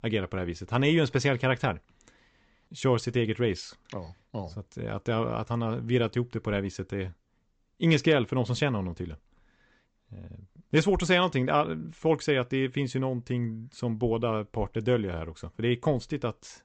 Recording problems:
high frequencies cut off; noticeable; nothing above 8 kHz

